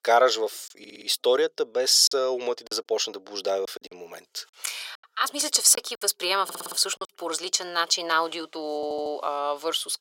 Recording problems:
thin; very; fading below 450 Hz
audio stuttering; at 1 s, at 6.5 s and at 9 s
choppy; very; from 2 to 4 s and from 5 to 7 s; 8% of the speech affected

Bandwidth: 16 kHz